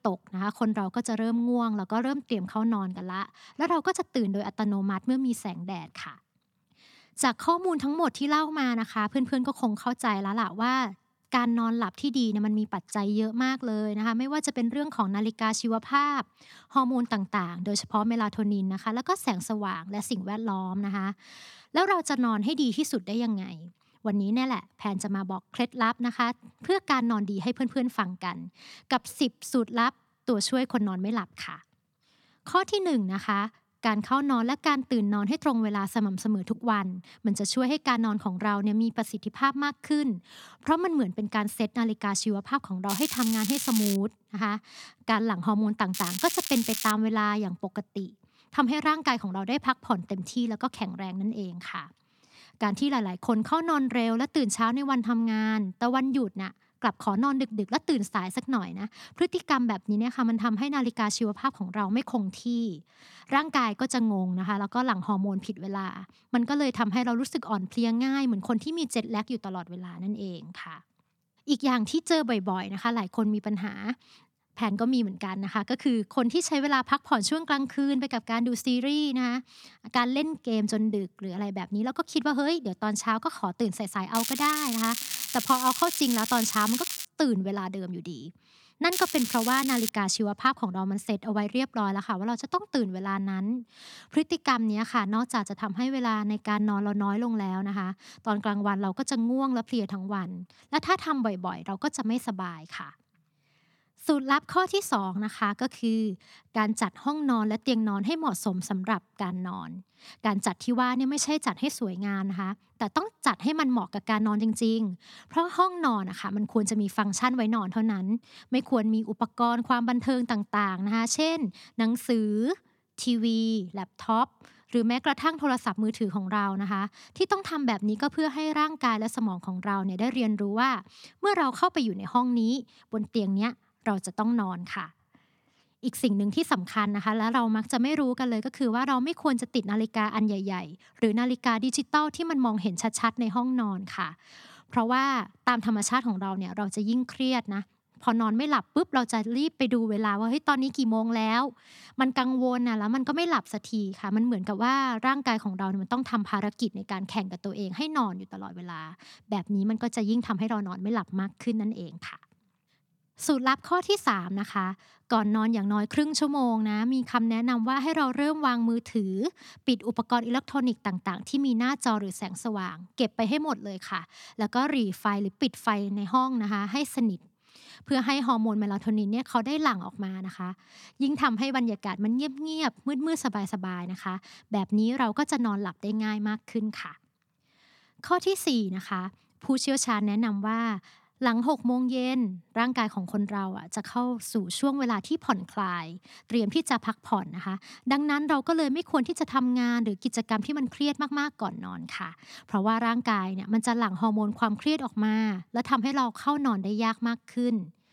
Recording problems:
crackling; loud; 4 times, first at 43 s; 4 dB below the speech

